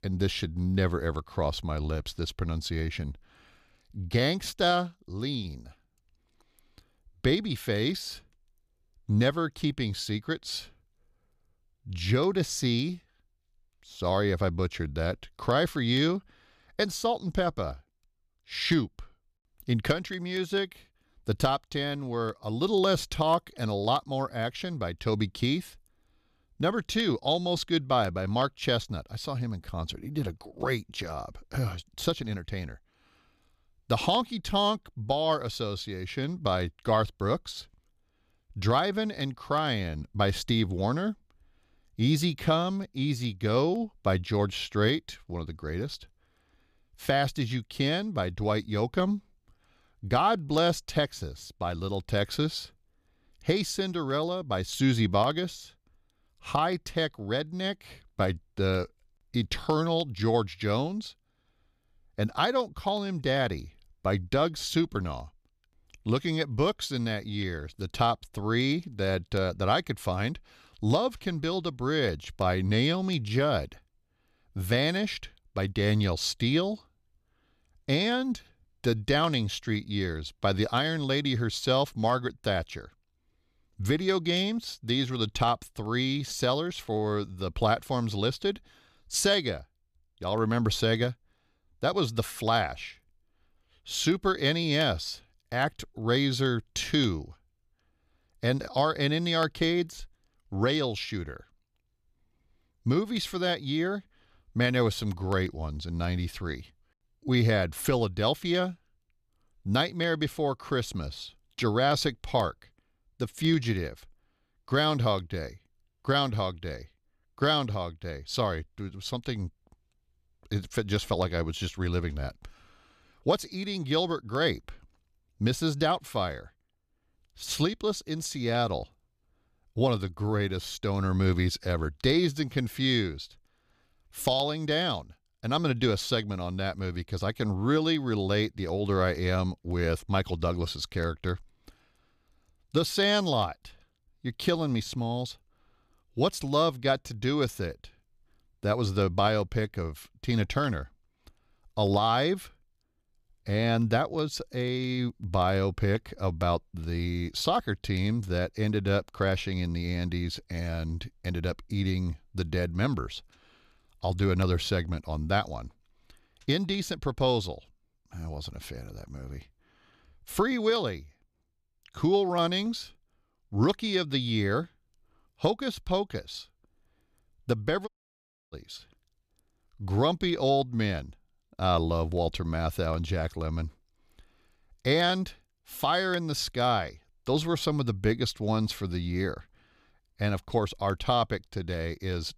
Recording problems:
audio cutting out; at 2:58 for 0.5 s

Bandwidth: 14.5 kHz